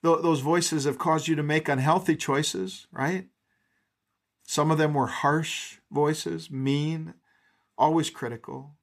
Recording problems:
none

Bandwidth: 14.5 kHz